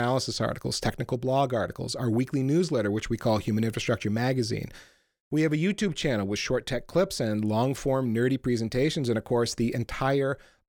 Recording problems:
abrupt cut into speech; at the start

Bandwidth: 18 kHz